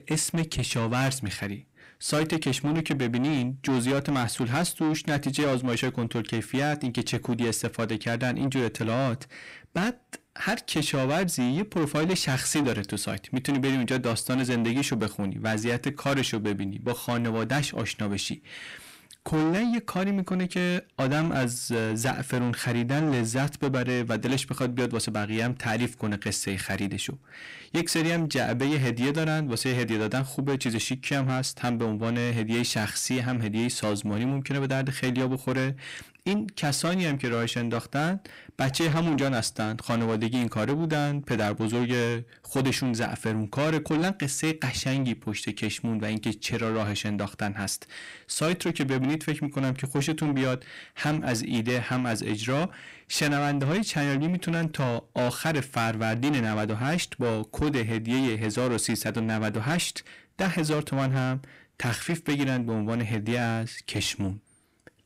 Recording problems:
distortion; heavy; 7 dB below the speech

